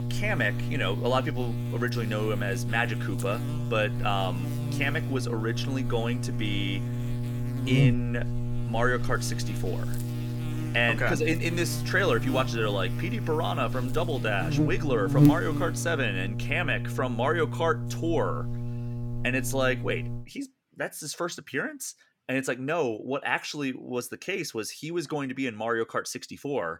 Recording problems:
electrical hum; loud; until 20 s; 60 Hz, 9 dB below the speech

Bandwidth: 17.5 kHz